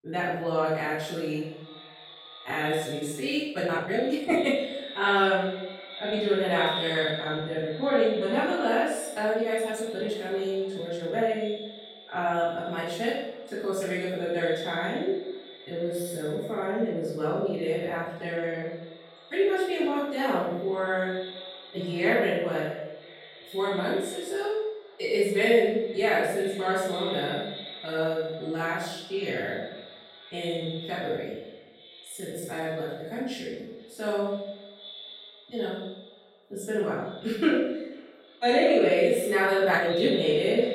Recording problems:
room echo; strong; dies away in 0.7 s
off-mic speech; far
echo of what is said; noticeable; throughout; 490 ms later, 15 dB below the speech
uneven, jittery; strongly; from 2 to 40 s

